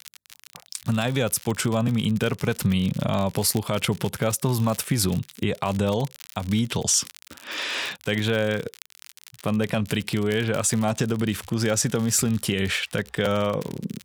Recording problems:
crackle, like an old record; faint; 20 dB below the speech

